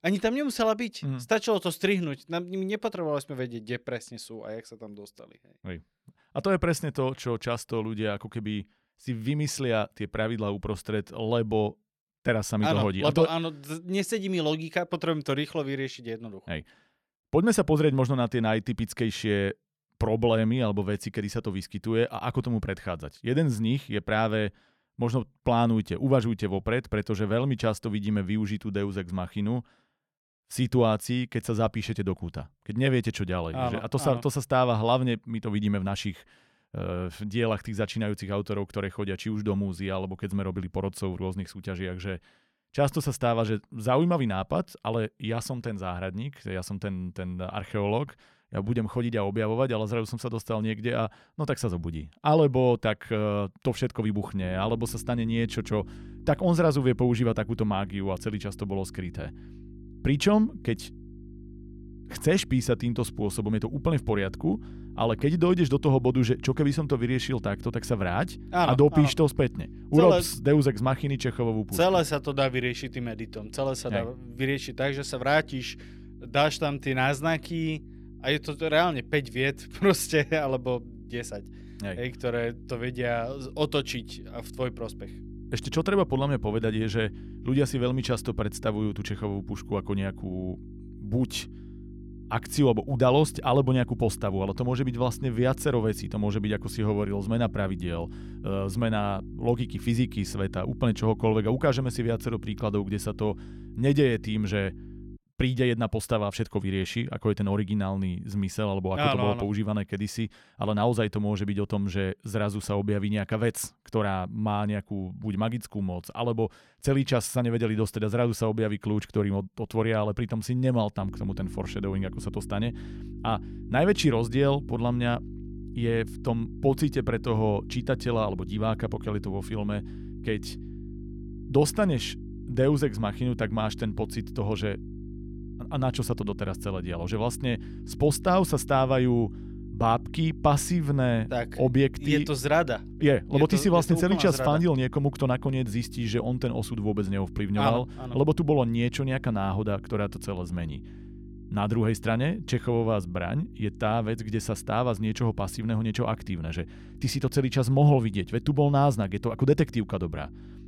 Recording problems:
electrical hum; faint; from 54 s to 1:45 and from 2:01 on; 50 Hz, 20 dB below the speech

